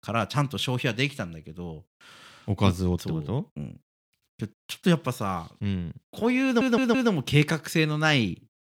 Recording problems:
audio stuttering; at 6.5 s

